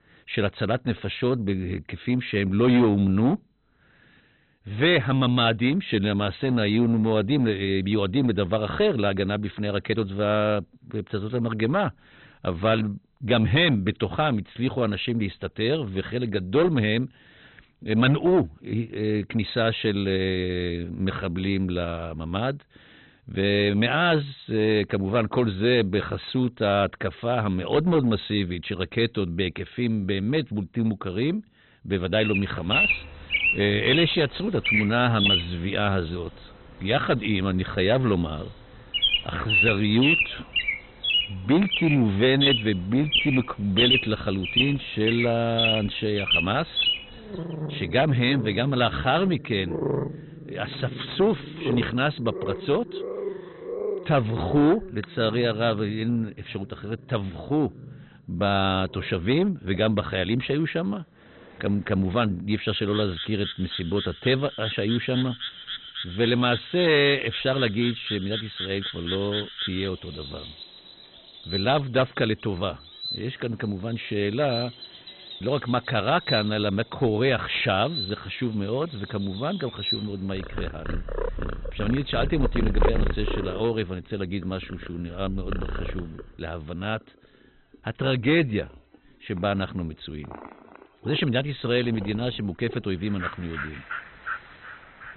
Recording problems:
garbled, watery; badly; nothing above 4 kHz
distortion; slight; 4% of the sound clipped
high frequencies cut off; slight
animal sounds; loud; from 32 s on; 2 dB below the speech

